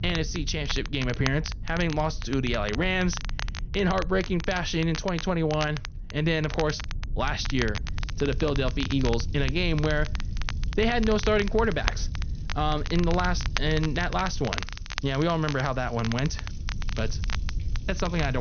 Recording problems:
high frequencies cut off; noticeable; nothing above 6.5 kHz
crackle, like an old record; noticeable; 10 dB below the speech
household noises; faint; throughout; 30 dB below the speech
low rumble; faint; throughout; 25 dB below the speech
abrupt cut into speech; at the end

